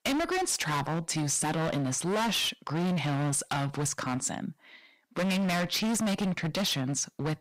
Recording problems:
distortion; heavy; 30% of the sound clipped

